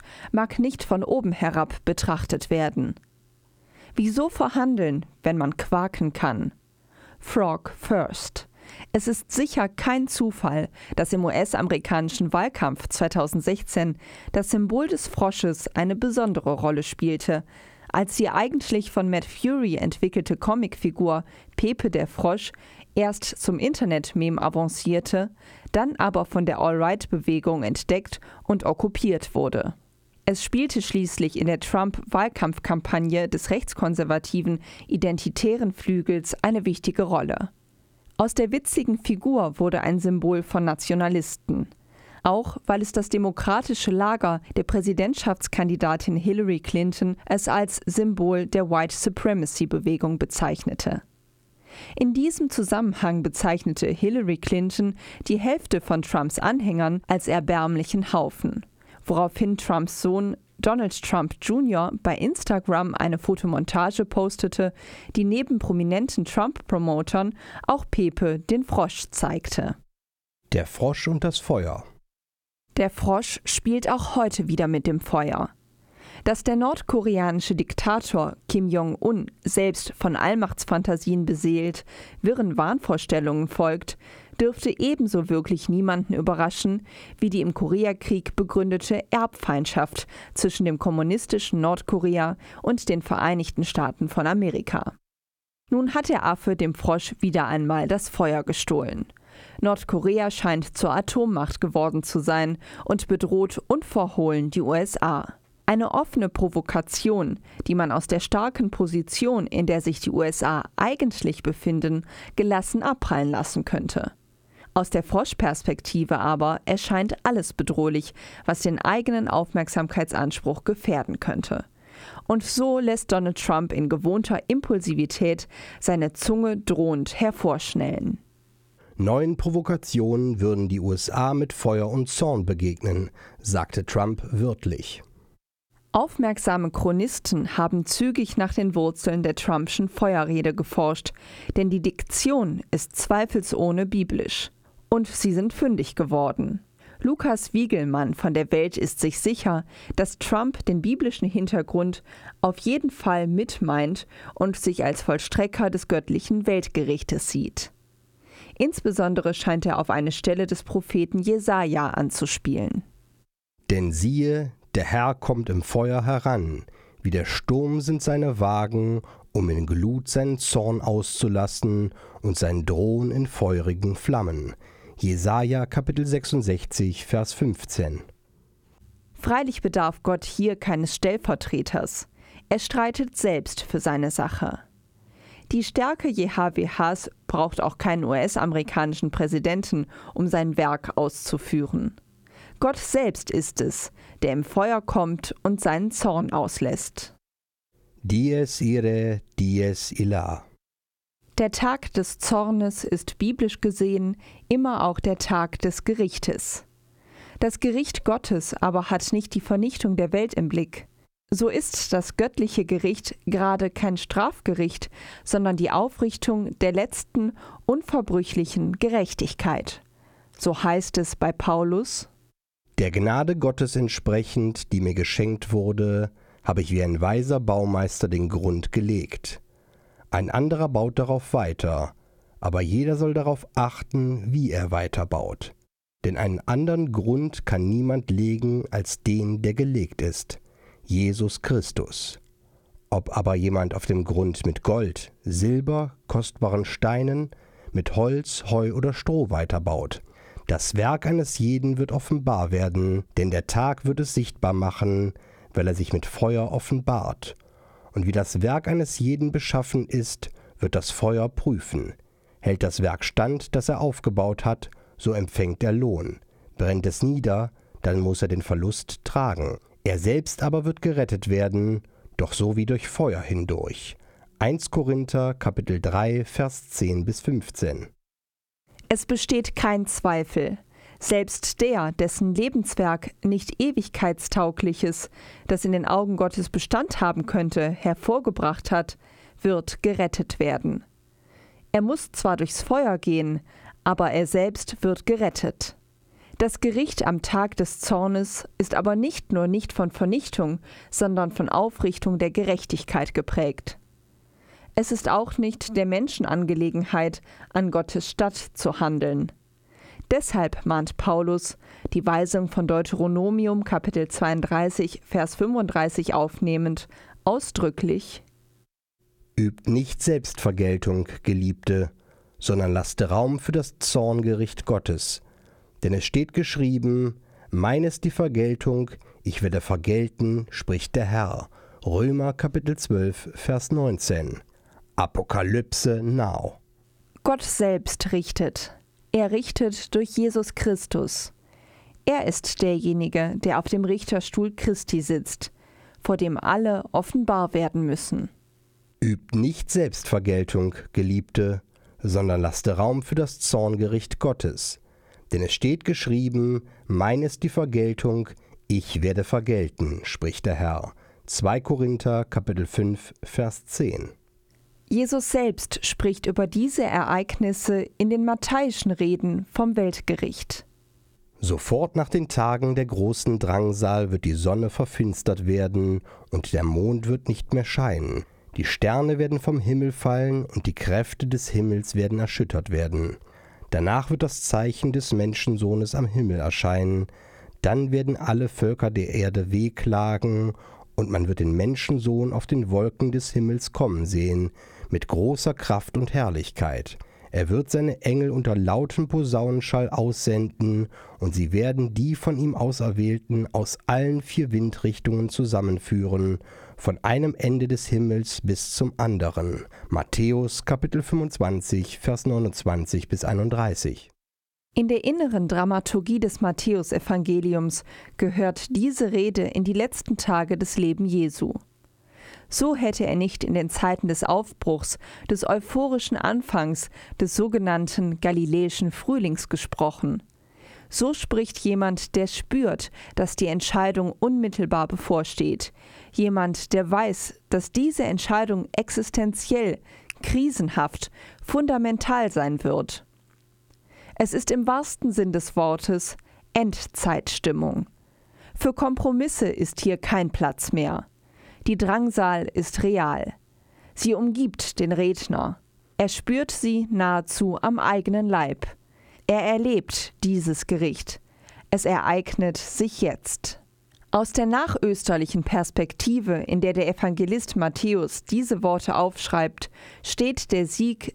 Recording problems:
squashed, flat; somewhat

